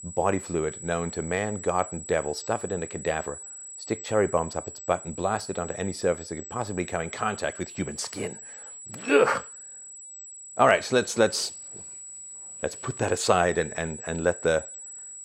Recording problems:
high-pitched whine; noticeable; throughout; 8 kHz, 10 dB below the speech

